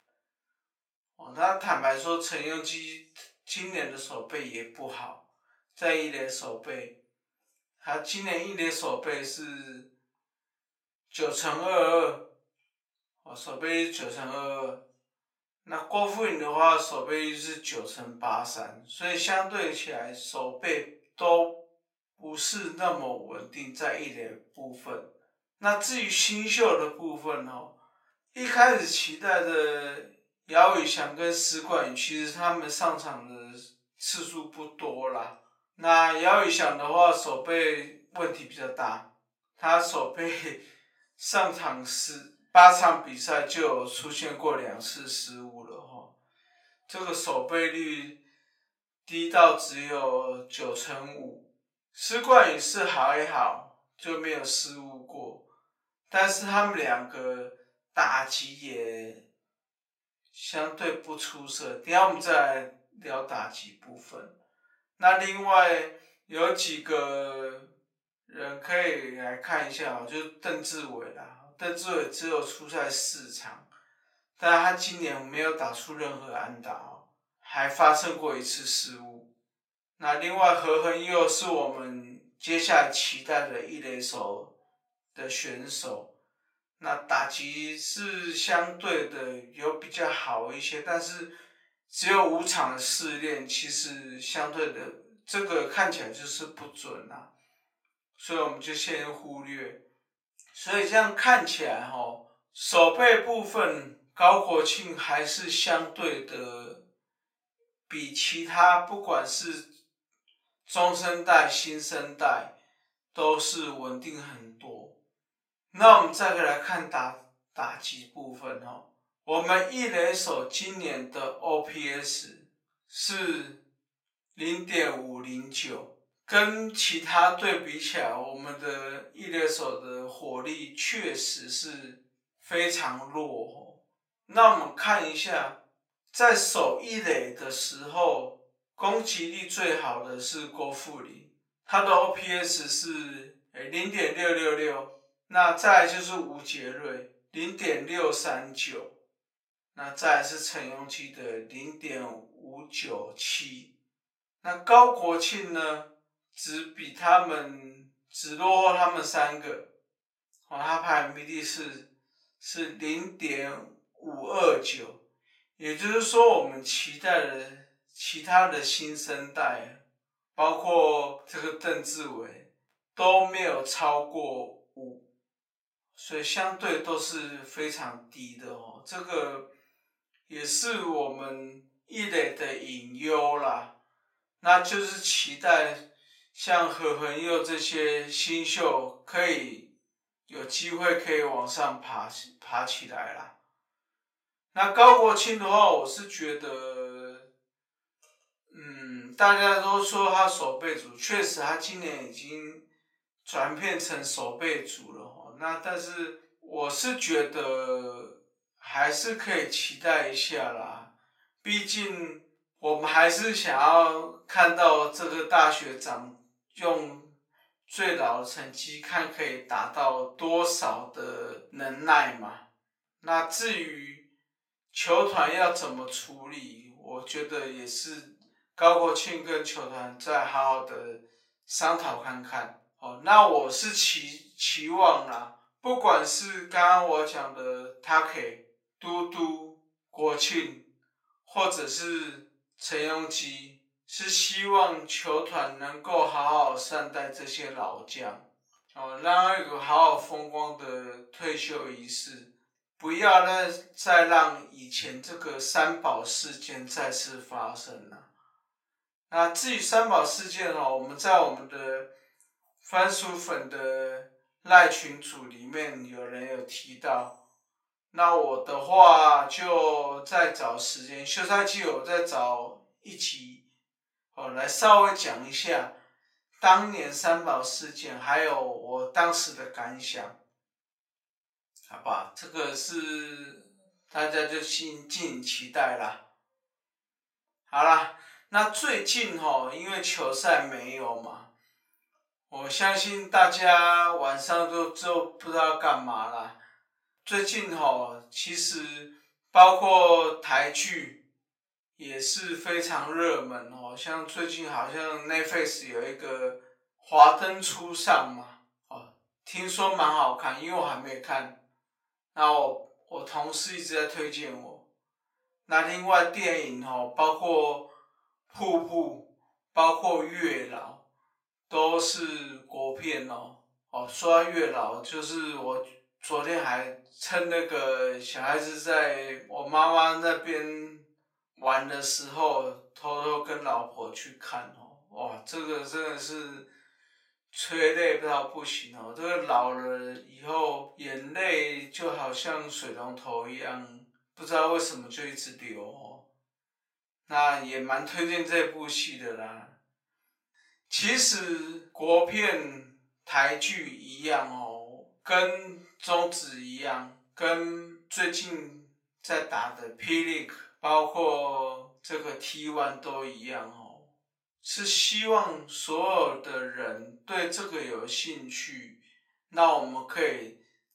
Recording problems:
off-mic speech; far
thin; very; fading below 750 Hz
wrong speed, natural pitch; too slow; 0.6 times normal speed
room echo; slight; dies away in 0.3 s

